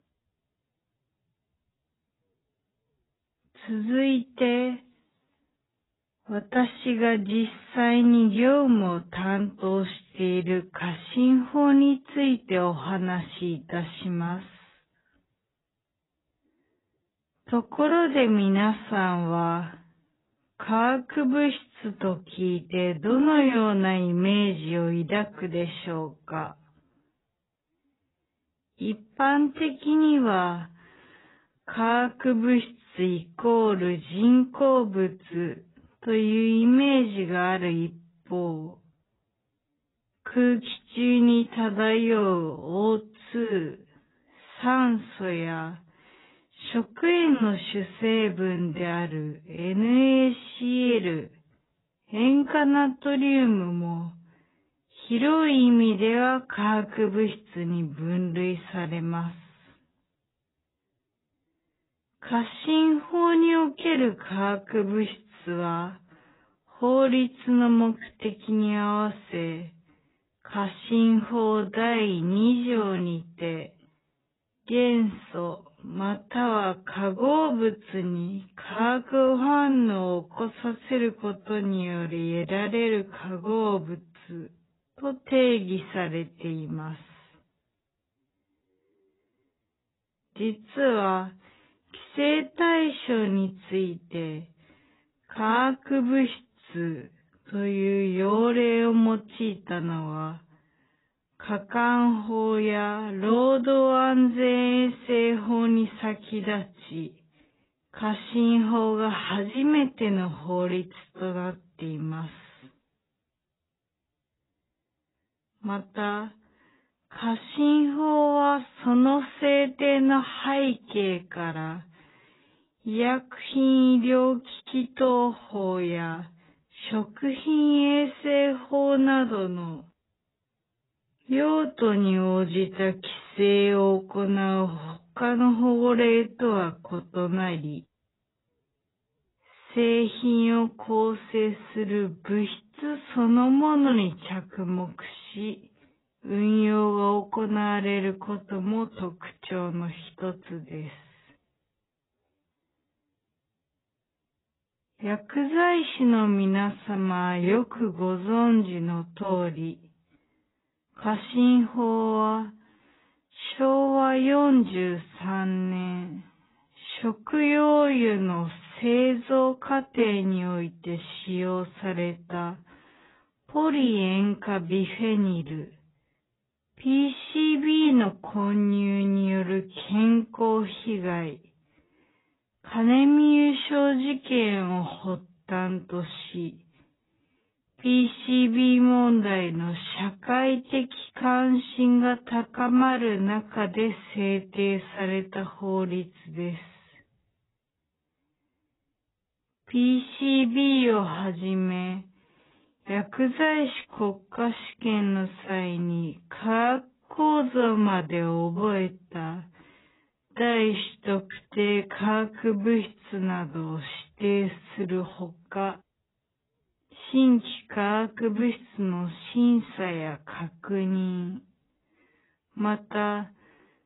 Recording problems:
garbled, watery; badly; nothing above 4 kHz
wrong speed, natural pitch; too slow; 0.5 times normal speed

